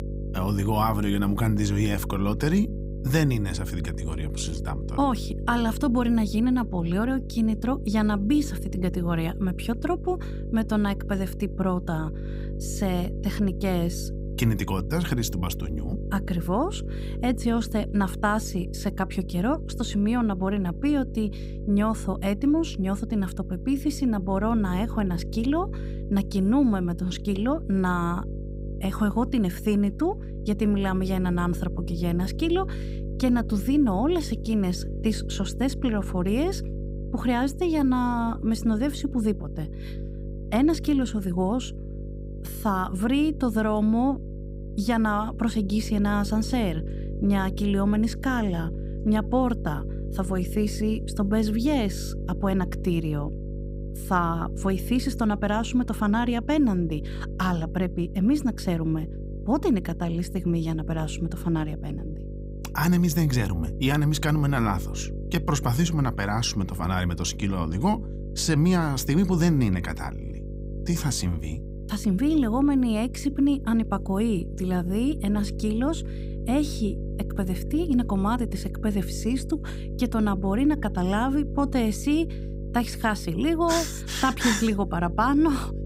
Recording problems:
electrical hum; noticeable; throughout; 50 Hz, 15 dB below the speech

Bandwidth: 15.5 kHz